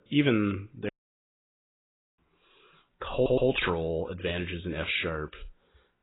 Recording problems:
garbled, watery; badly; nothing above 4 kHz
audio cutting out; at 1 s for 1.5 s
audio stuttering; at 3 s

